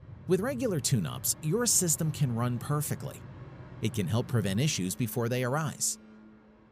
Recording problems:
train or aircraft noise; noticeable; throughout; 15 dB below the speech

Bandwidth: 15 kHz